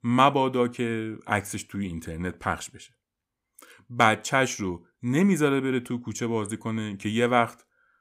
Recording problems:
none

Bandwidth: 15.5 kHz